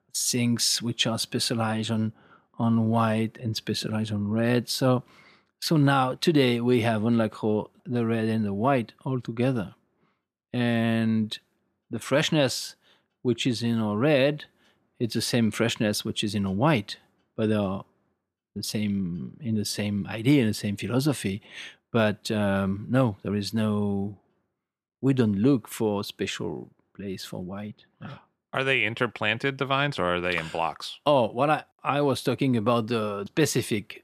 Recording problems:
none

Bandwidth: 14.5 kHz